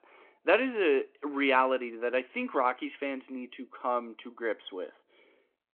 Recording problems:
phone-call audio

